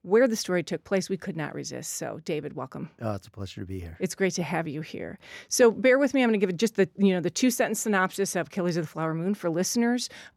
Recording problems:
none

